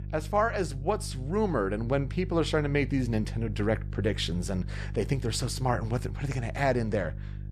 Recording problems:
electrical hum; faint; throughout; 50 Hz, 20 dB below the speech

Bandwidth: 14 kHz